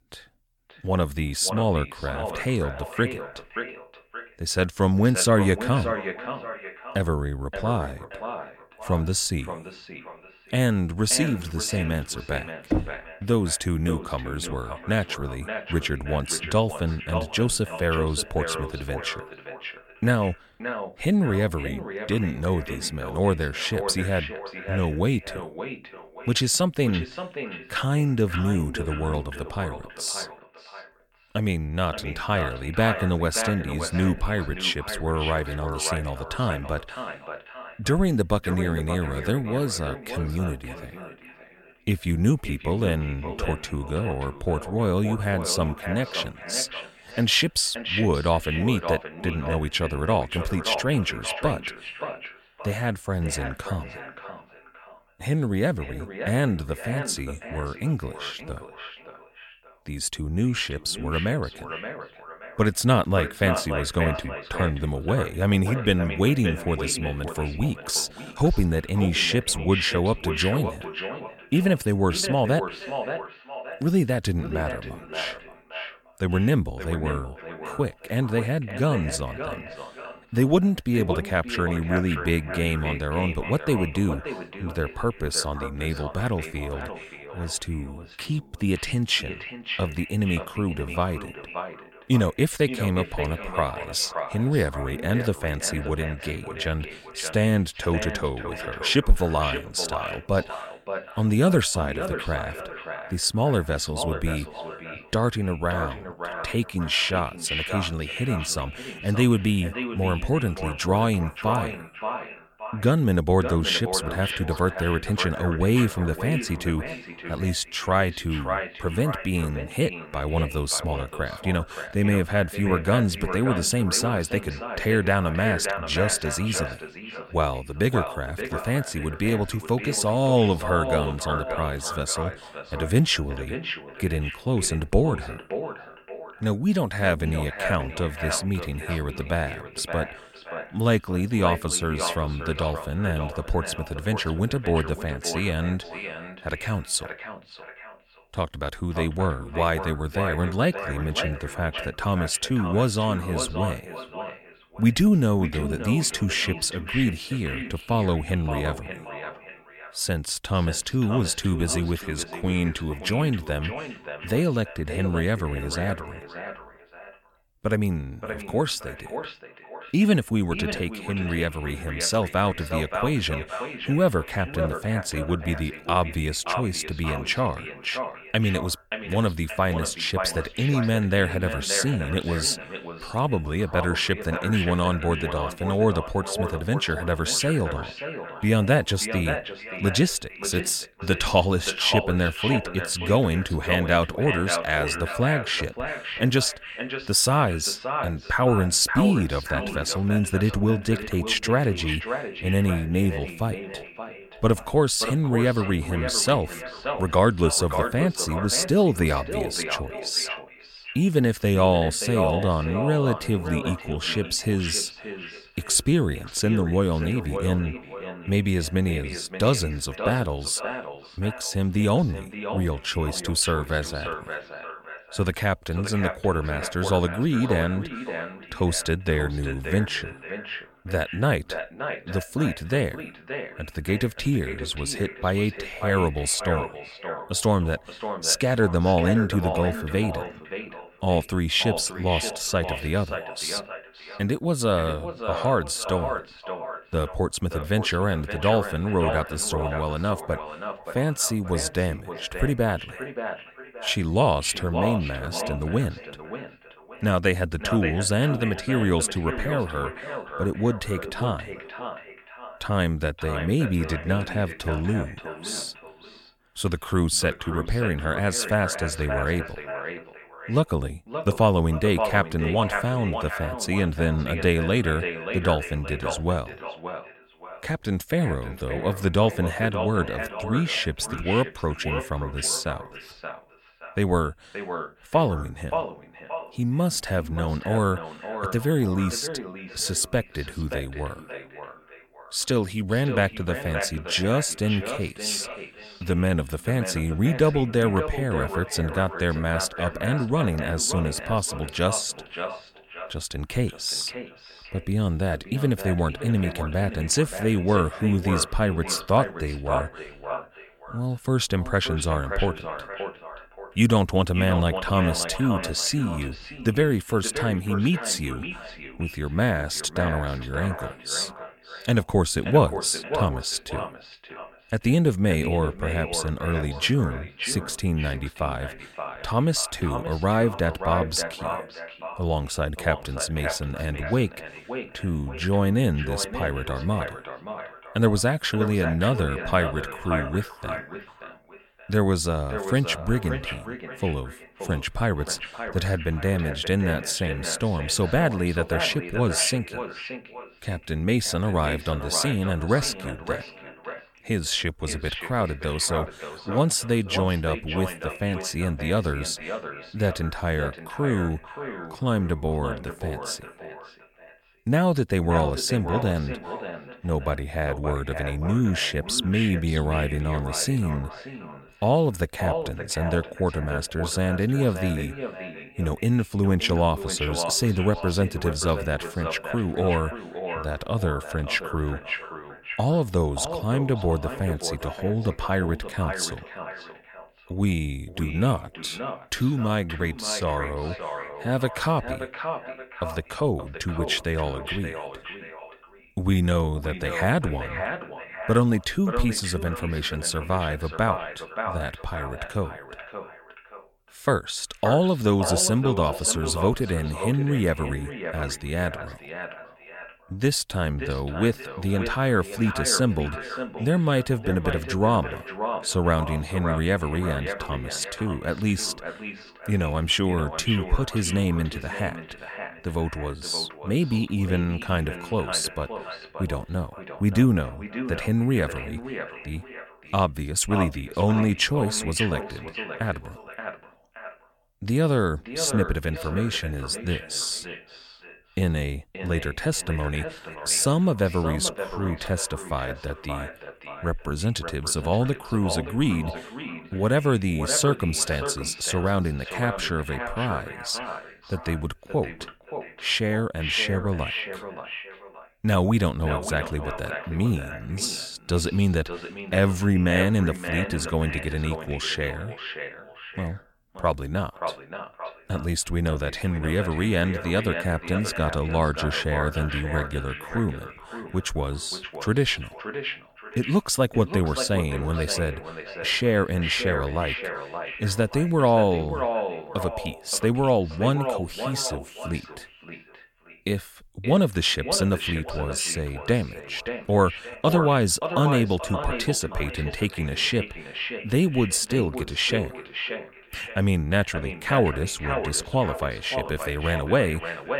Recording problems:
echo of what is said; strong; throughout; 580 ms later, 9 dB below the speech
door banging; noticeable; at 13 s; peak 2 dB below the speech

